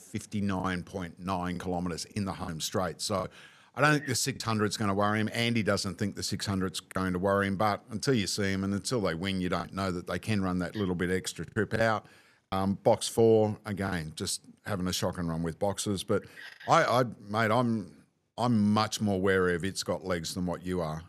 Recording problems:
choppy; occasionally; 3% of the speech affected

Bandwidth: 13.5 kHz